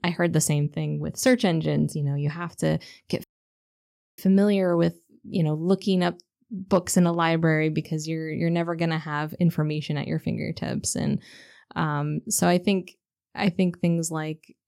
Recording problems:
audio cutting out; at 3 s for 1 s

